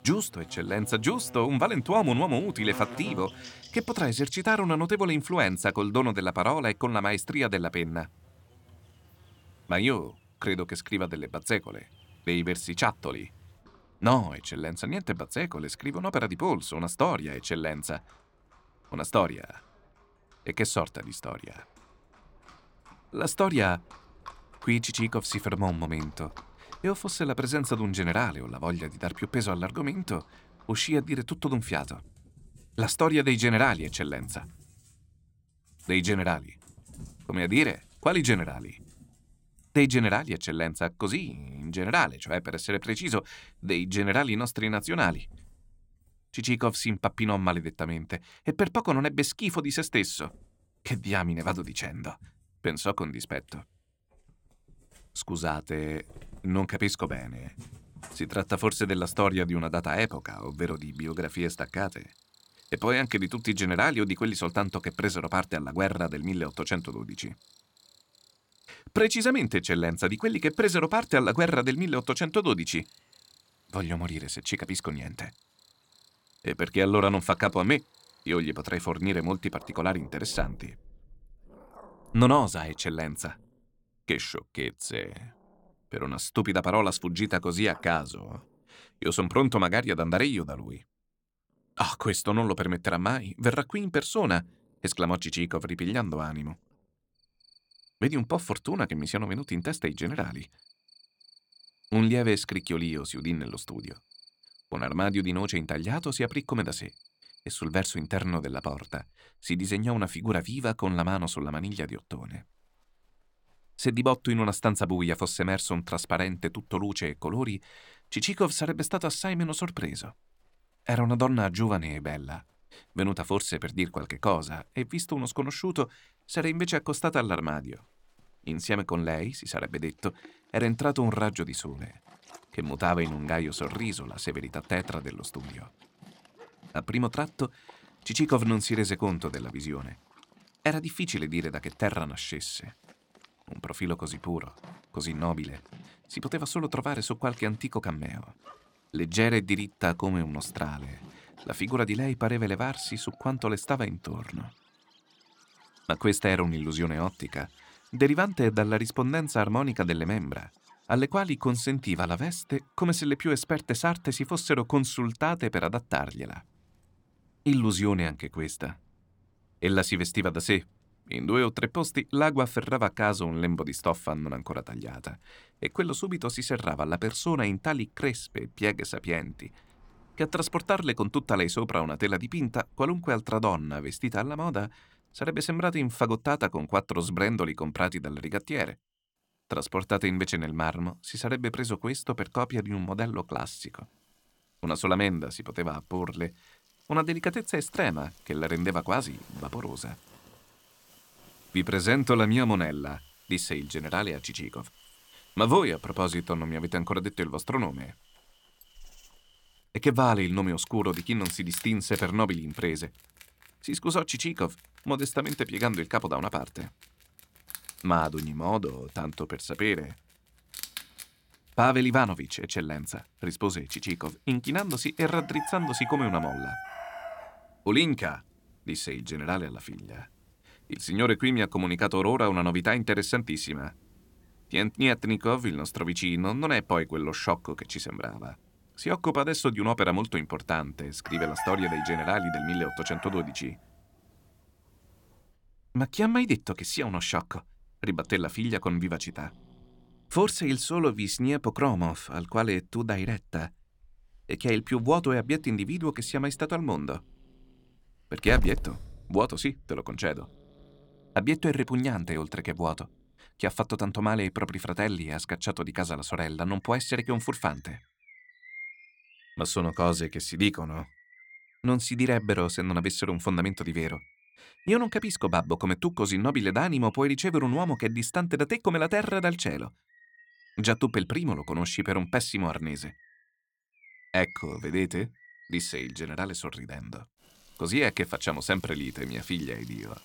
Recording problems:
animal sounds; noticeable; throughout; 20 dB below the speech

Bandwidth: 17 kHz